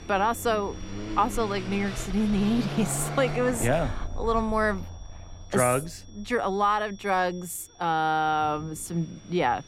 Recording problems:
traffic noise; loud; throughout; 9 dB below the speech
high-pitched whine; faint; throughout; 5.5 kHz, 25 dB below the speech
background music; faint; throughout; 30 dB below the speech
rain or running water; faint; throughout; 25 dB below the speech

